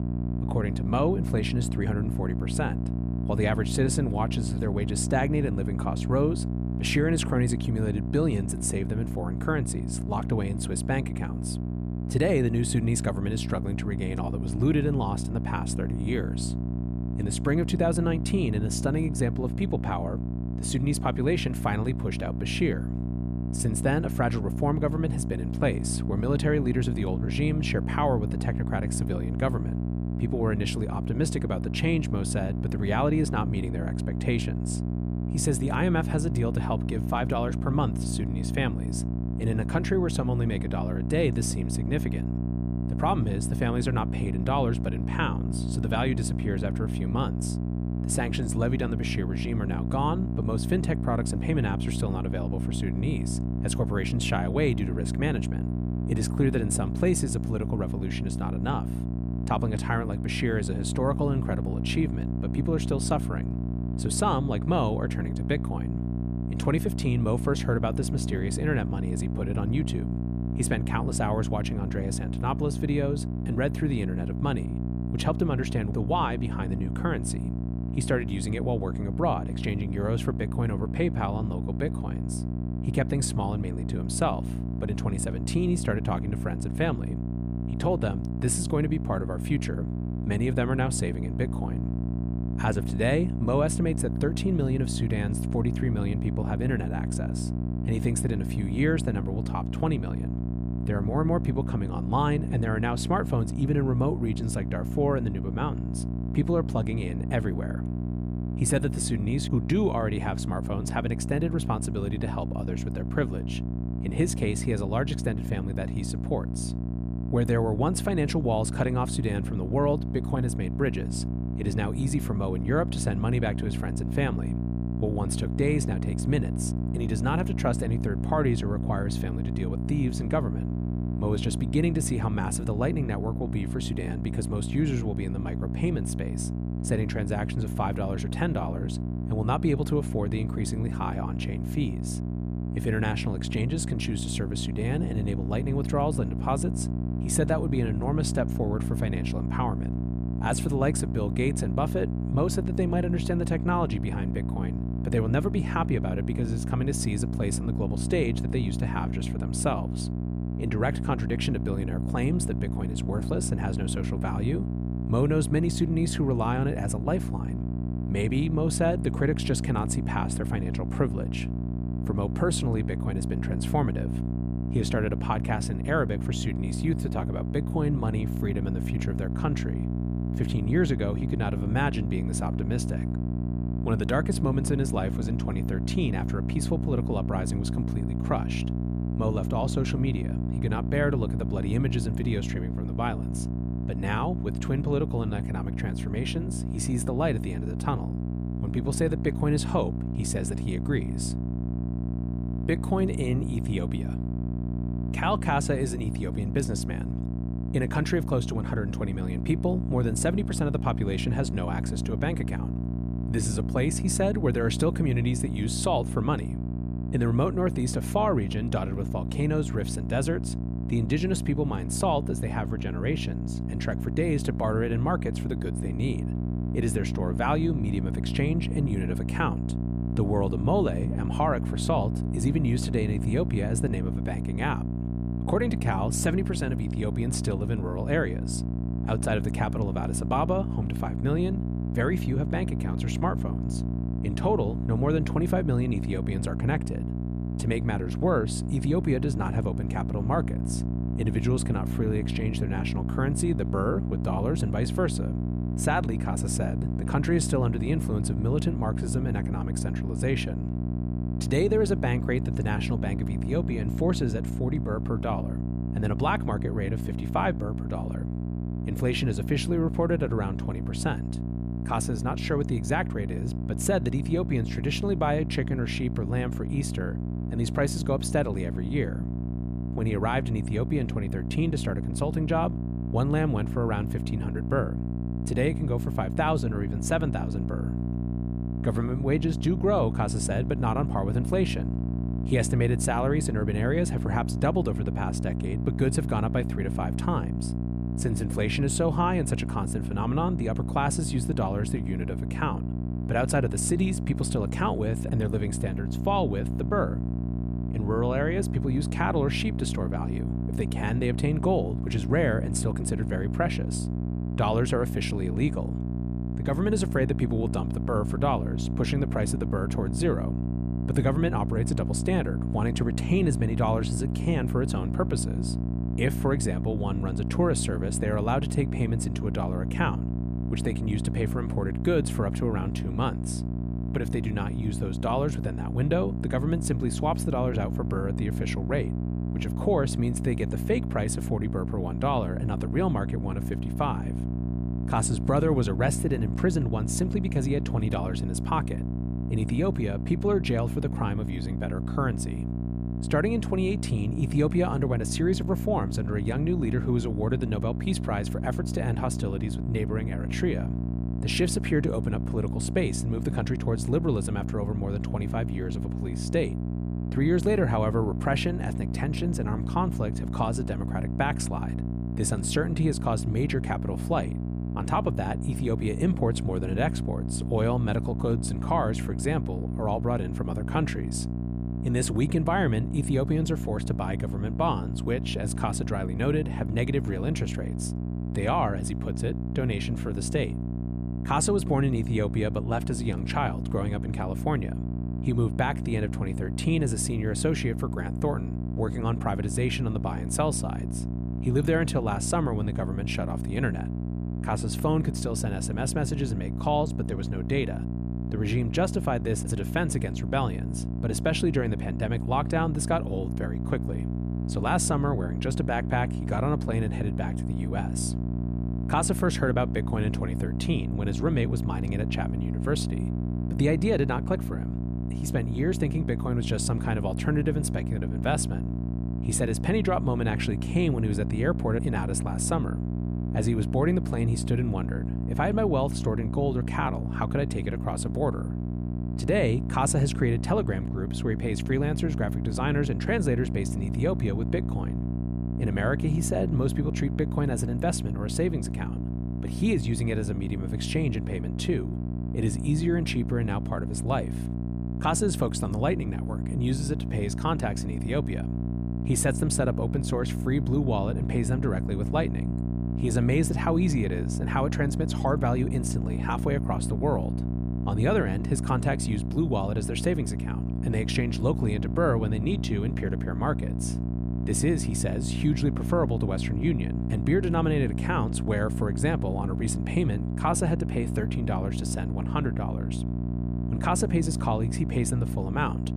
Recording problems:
electrical hum; loud; throughout; 60 Hz, 8 dB below the speech

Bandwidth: 14.5 kHz